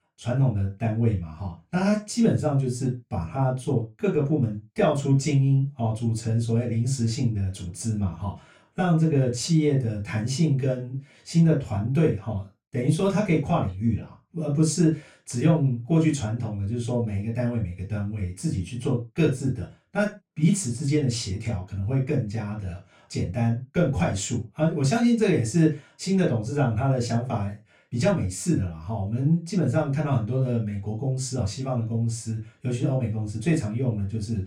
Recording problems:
off-mic speech; far
room echo; slight; dies away in 0.2 s

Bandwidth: 18.5 kHz